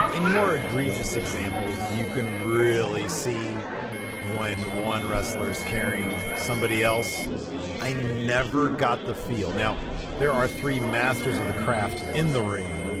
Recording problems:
garbled, watery; slightly; nothing above 16.5 kHz
high-pitched whine; loud; until 2.5 s, from 4 to 7.5 s and from 10 s on; 2 kHz, 7 dB below the speech
murmuring crowd; loud; throughout; 3 dB below the speech
uneven, jittery; strongly; from 1.5 to 9 s

